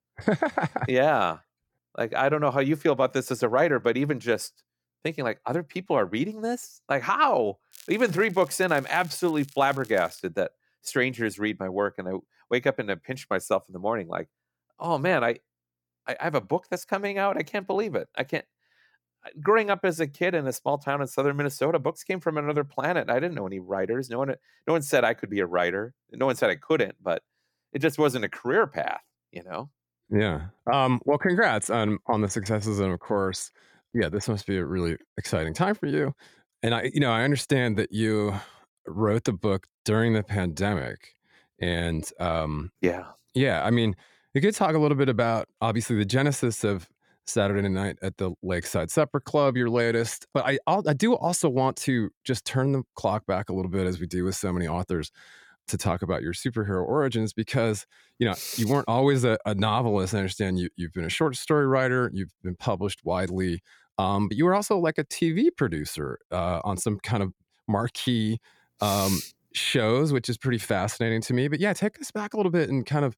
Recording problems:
crackling; faint; from 7.5 to 10 s; 25 dB below the speech

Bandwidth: 17.5 kHz